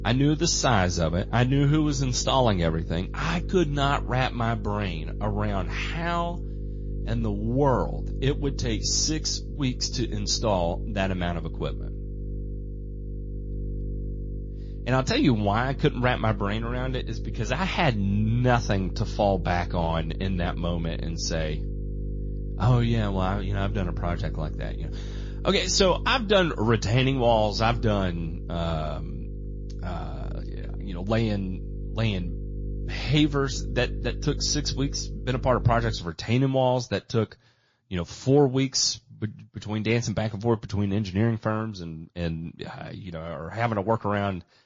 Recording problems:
garbled, watery; slightly; nothing above 7 kHz
electrical hum; noticeable; until 36 s; 50 Hz, 20 dB below the speech

